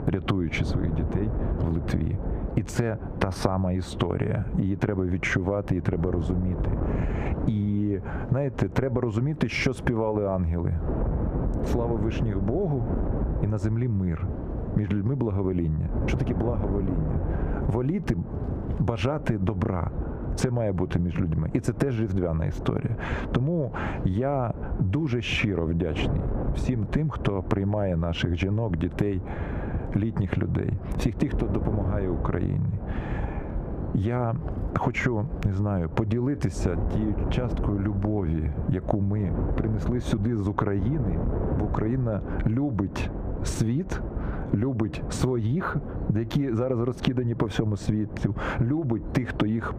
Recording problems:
squashed, flat; heavily
muffled; slightly; fading above 3.5 kHz
wind noise on the microphone; heavy; 8 dB below the speech

